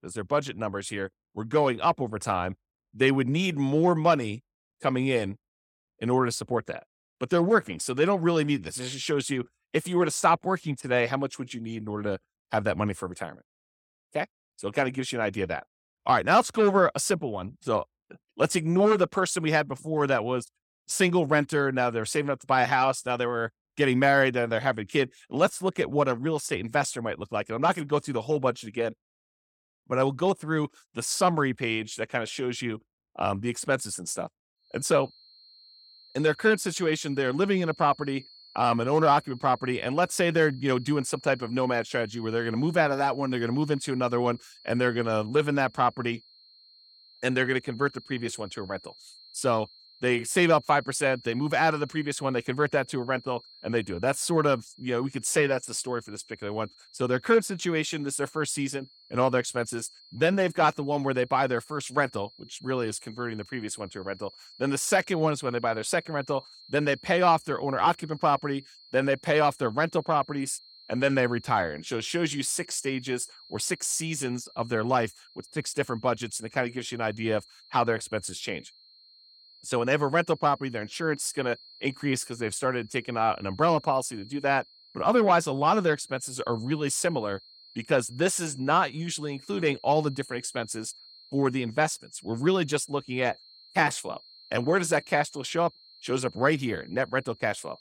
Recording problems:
high-pitched whine; faint; from 35 s on; 4 kHz, 25 dB below the speech

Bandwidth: 17 kHz